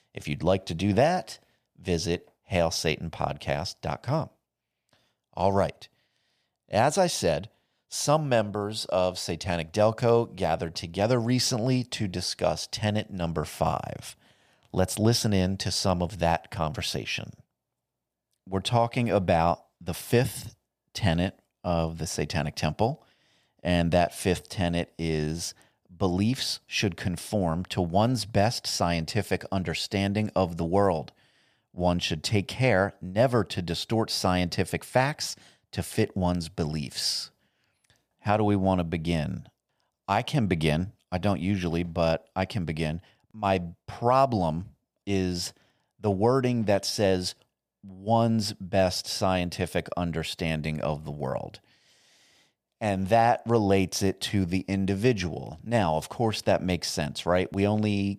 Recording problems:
none

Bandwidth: 15 kHz